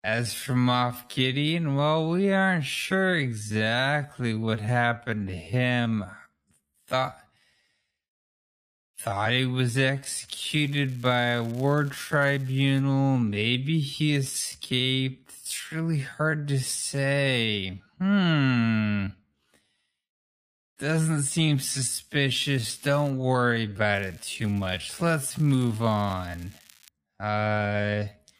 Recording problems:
wrong speed, natural pitch; too slow; 0.5 times normal speed
crackling; faint; from 10 to 13 s, at 22 s and from 24 to 27 s; 25 dB below the speech

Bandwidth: 15 kHz